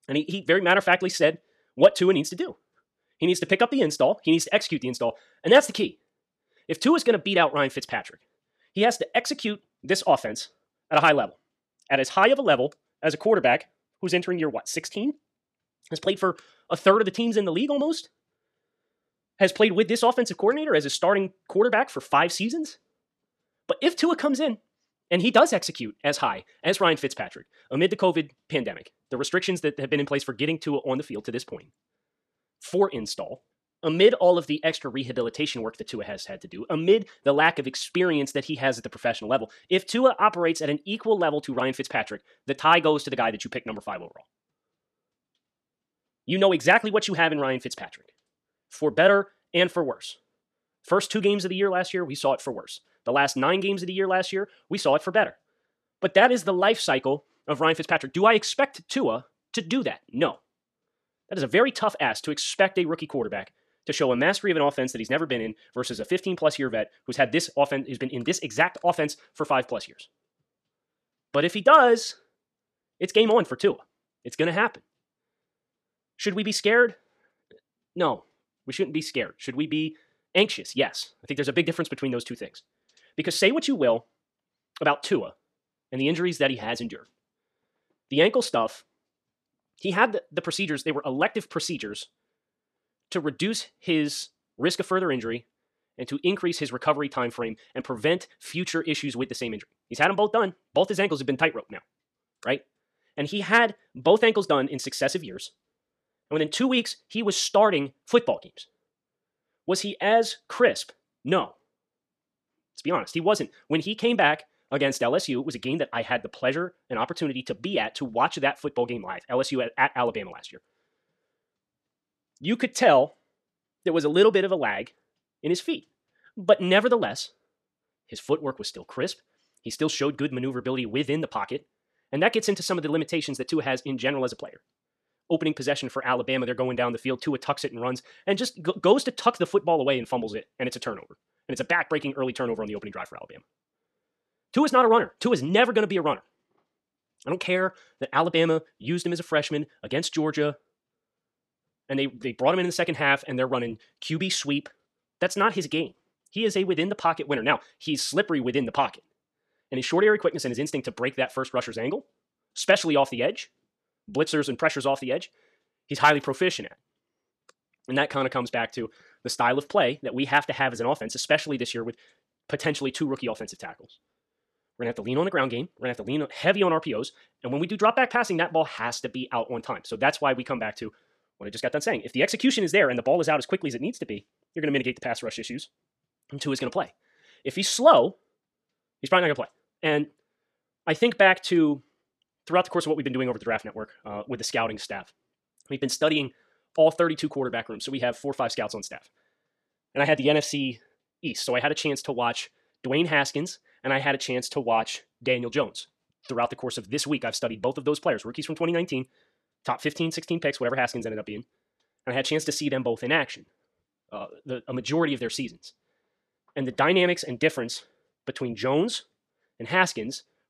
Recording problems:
wrong speed, natural pitch; too fast; 1.5 times normal speed

